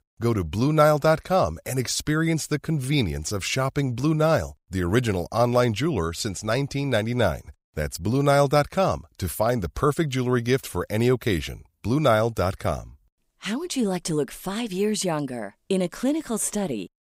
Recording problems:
none

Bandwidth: 15.5 kHz